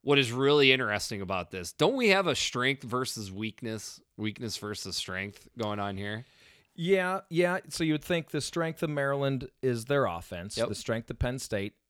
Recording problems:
none

